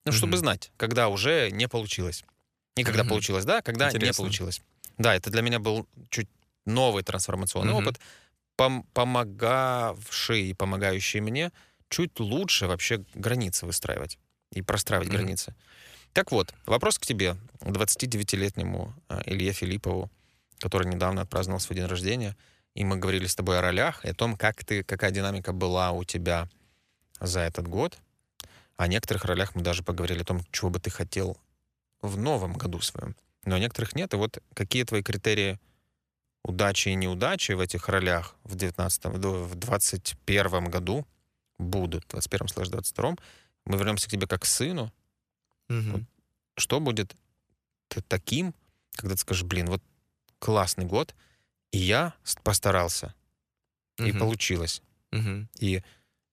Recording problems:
none

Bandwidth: 14.5 kHz